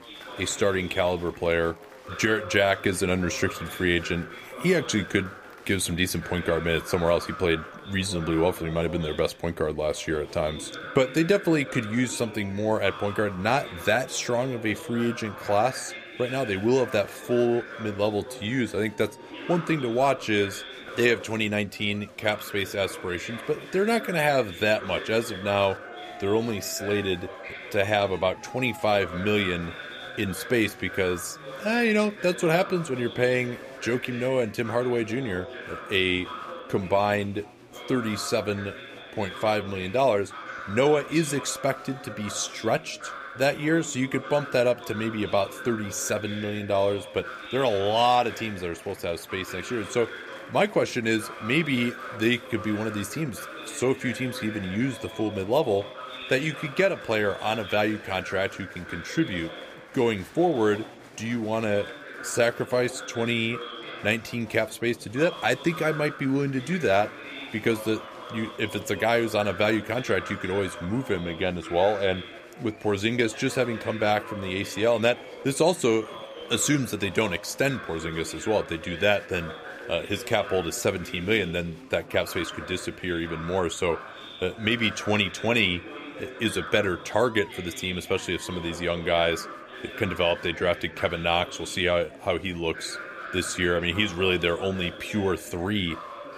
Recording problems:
chatter from many people; noticeable; throughout; 15 dB below the speech

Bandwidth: 15 kHz